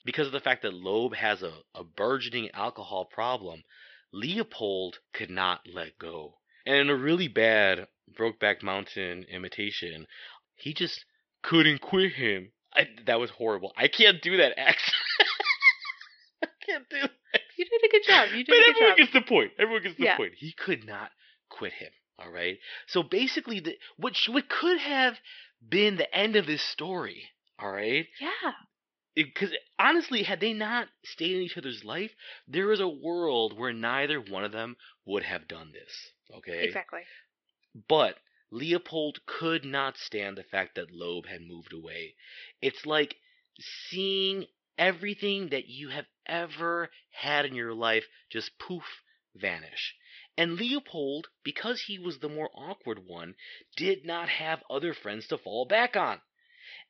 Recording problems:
thin; somewhat; fading below 1 kHz
high frequencies cut off; noticeable; nothing above 5.5 kHz

